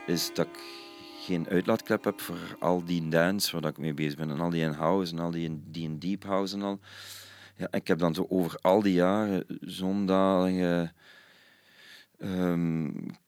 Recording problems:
background music; faint; throughout; 20 dB below the speech

